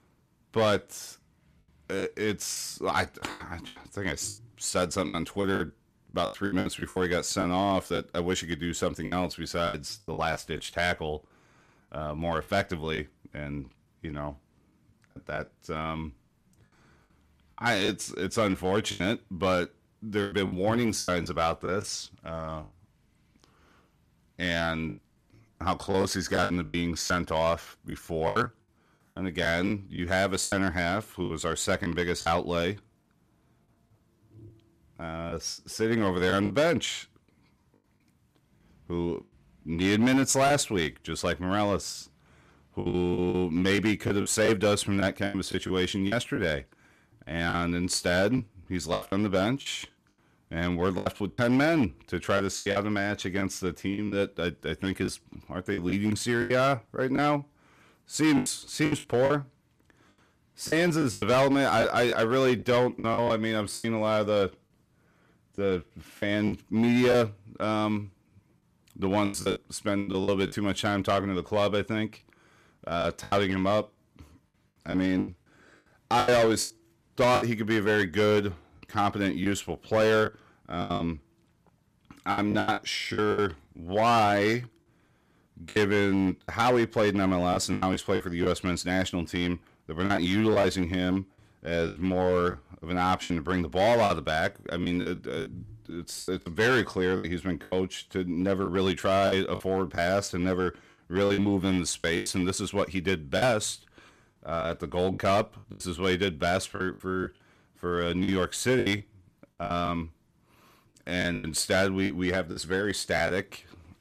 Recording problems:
distortion; slight; 4% of the sound clipped
choppy; very; 9% of the speech affected

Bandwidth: 14.5 kHz